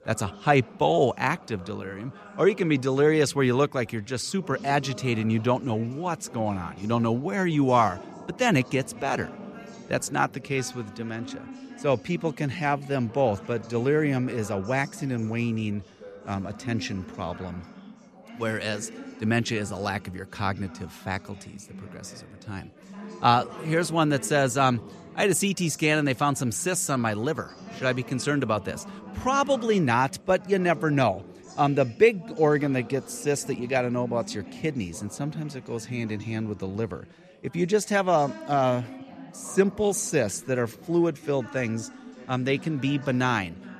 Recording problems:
background chatter; noticeable; throughout; 4 voices, 15 dB below the speech

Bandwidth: 14.5 kHz